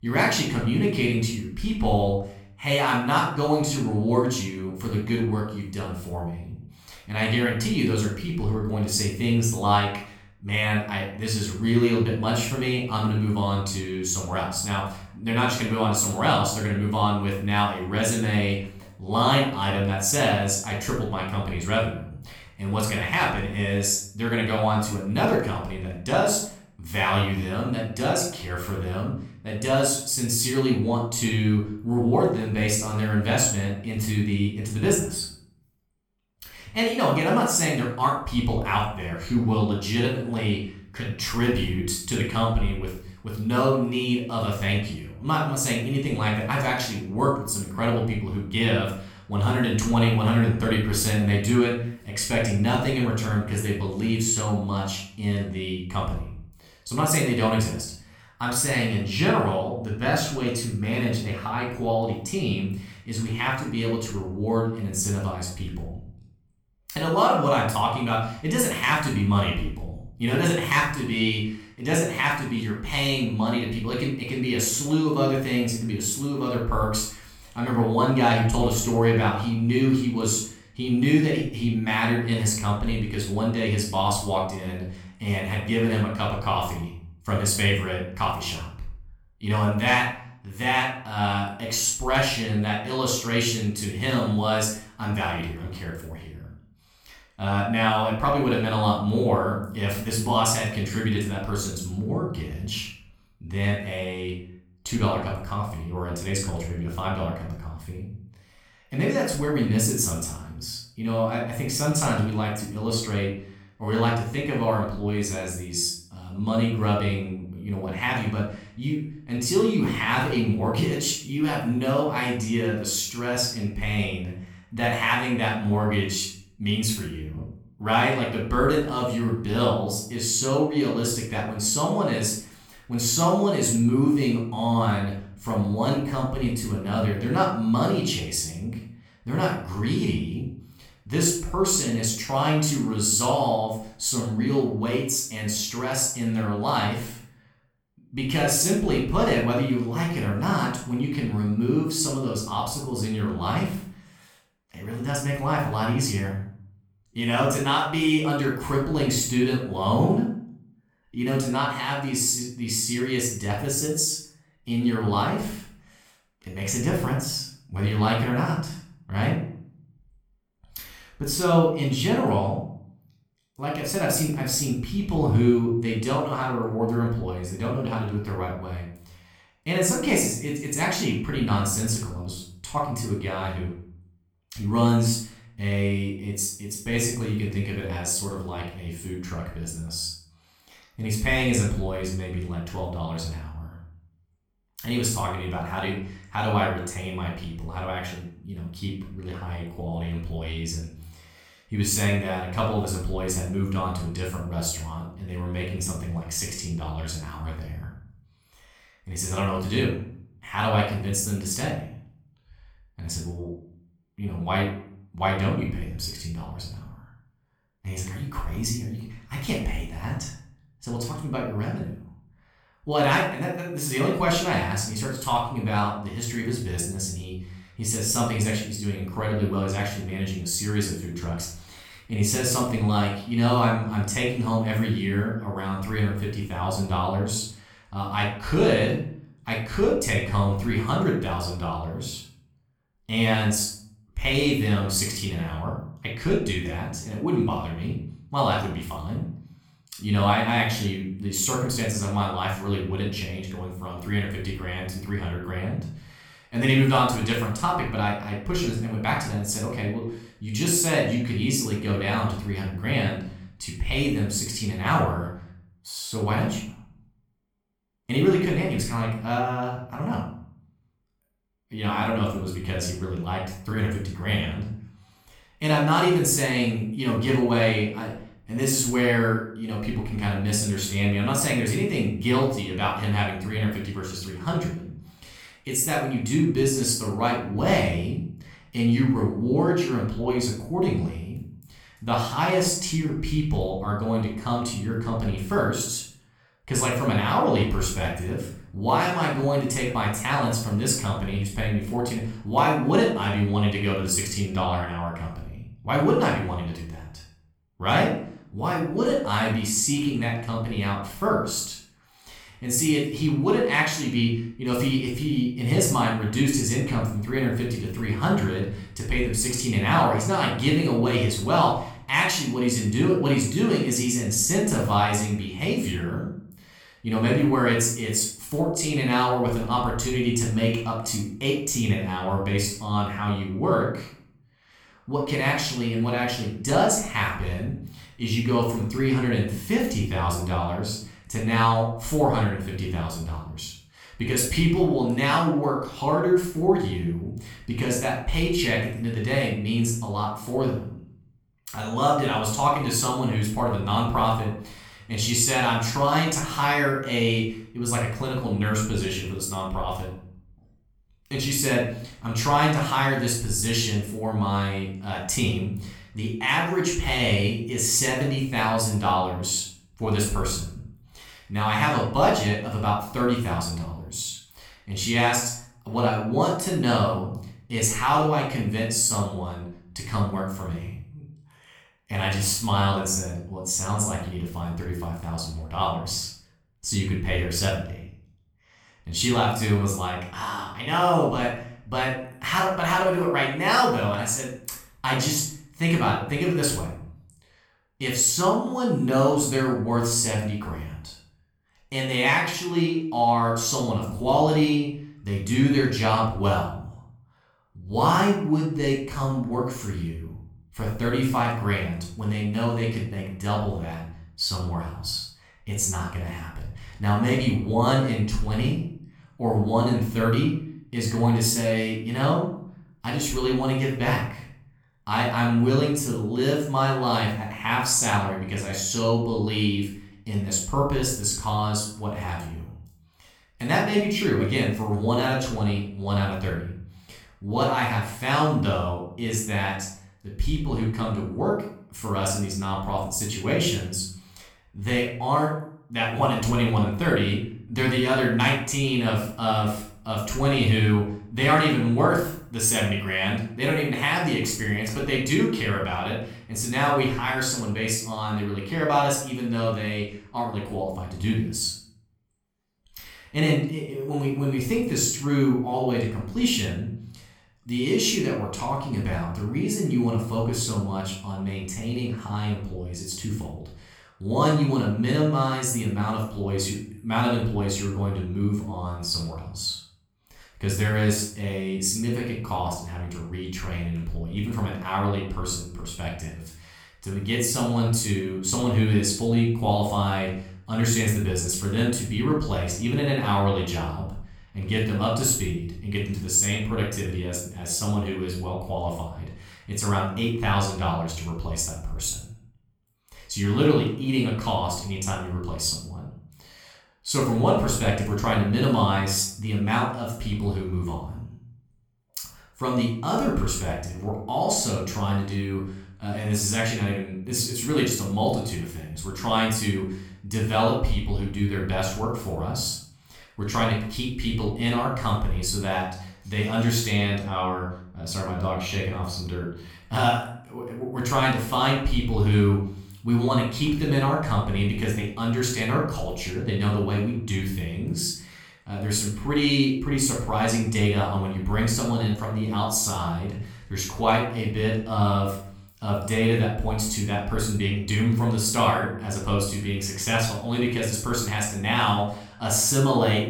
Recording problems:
room echo; noticeable; dies away in 0.5 s
off-mic speech; somewhat distant

